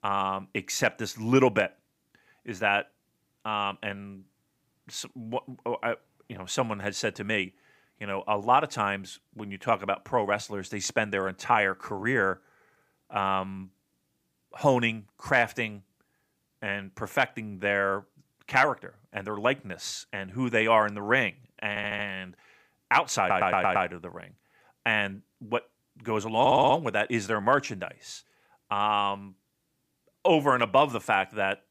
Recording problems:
audio stuttering; at 22 s, at 23 s and at 26 s

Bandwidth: 15 kHz